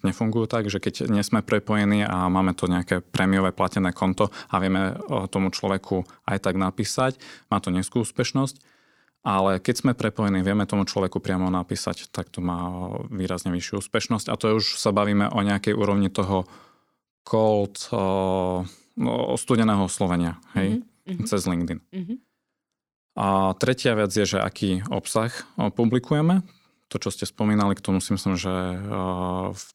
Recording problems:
none

